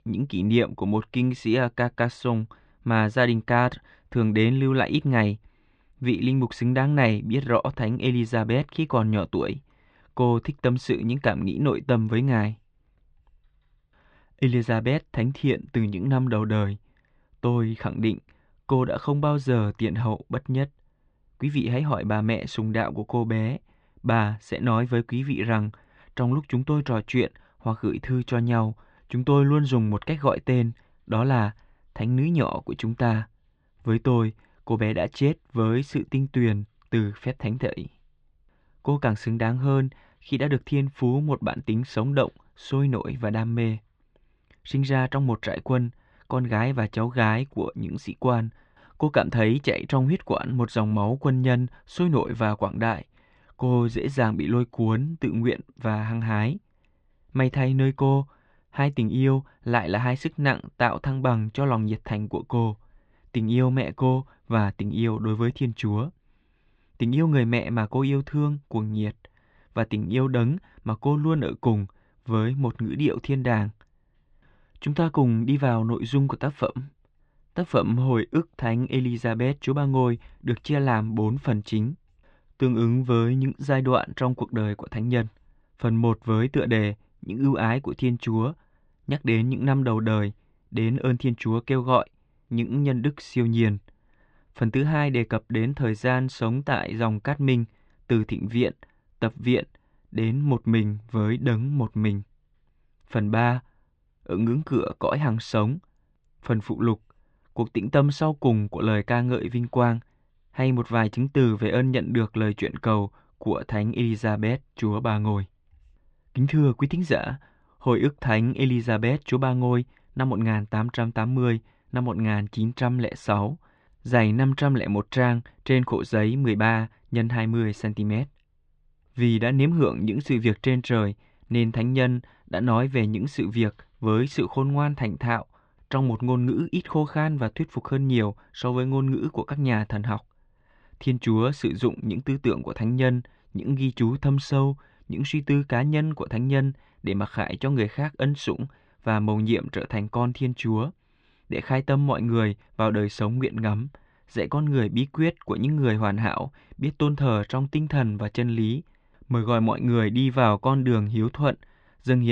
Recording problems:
muffled; very; fading above 3.5 kHz
abrupt cut into speech; at the end

